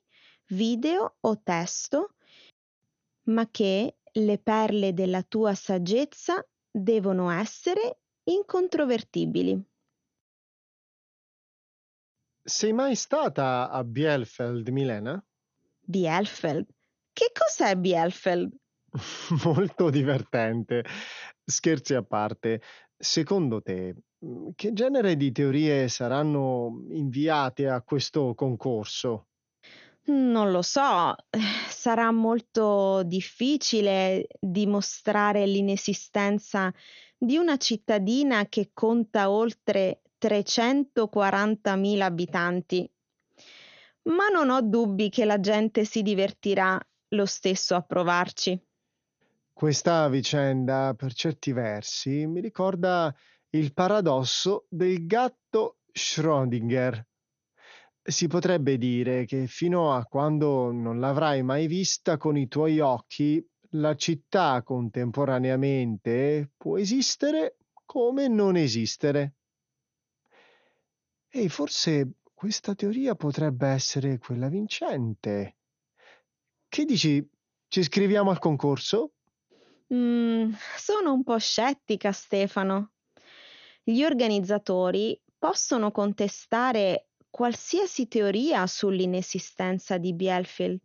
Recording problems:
garbled, watery; slightly; nothing above 6.5 kHz

